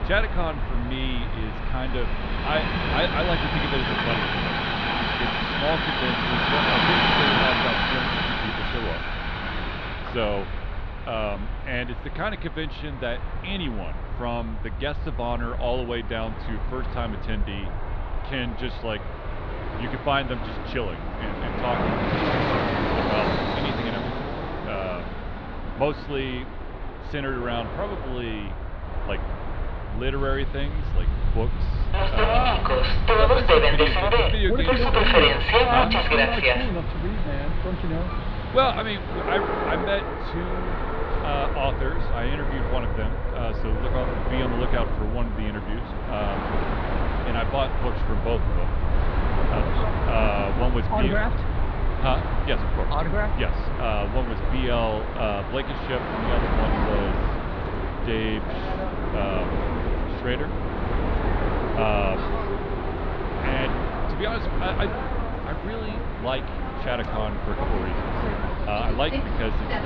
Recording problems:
muffled; very slightly; fading above 4 kHz
train or aircraft noise; very loud; throughout; 3 dB above the speech
low rumble; faint; throughout; 20 dB below the speech

